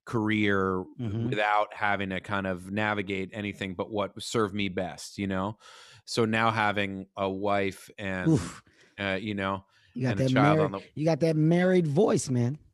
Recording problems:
none

